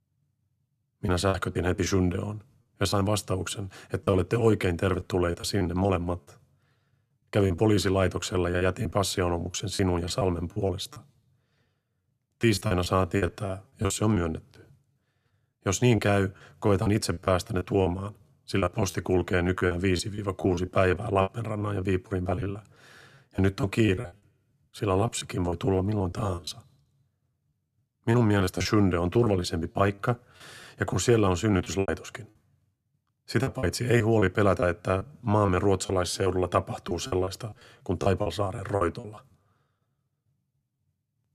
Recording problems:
choppy; very; 13% of the speech affected

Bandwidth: 14.5 kHz